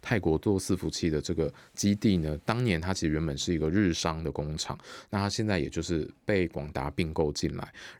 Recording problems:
none

